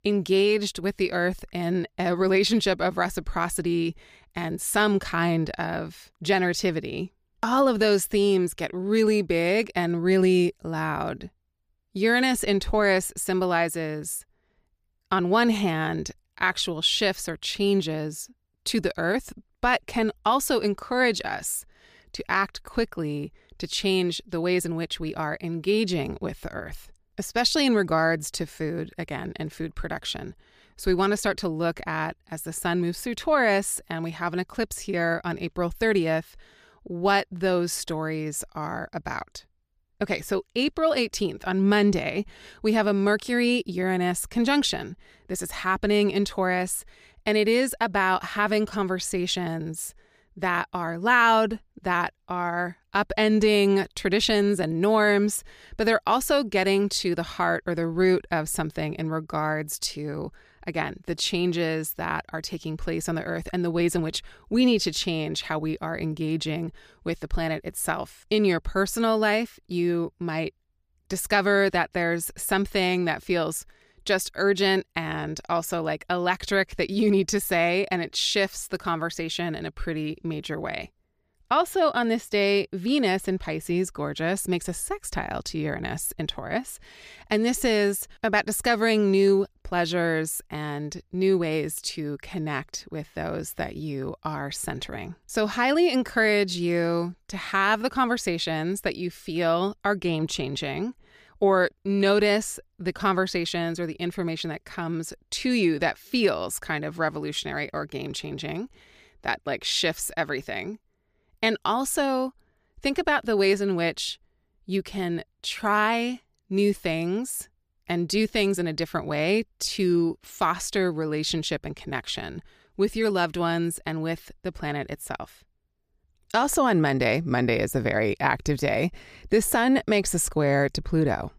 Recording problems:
none

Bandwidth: 15 kHz